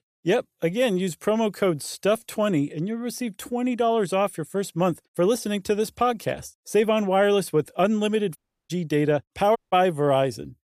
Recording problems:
audio cutting out; at 8.5 s and at 9.5 s

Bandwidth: 14.5 kHz